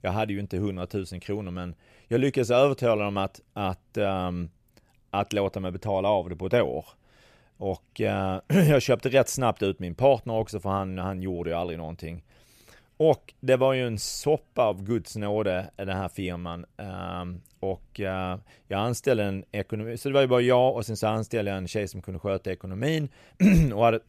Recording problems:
none

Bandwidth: 14.5 kHz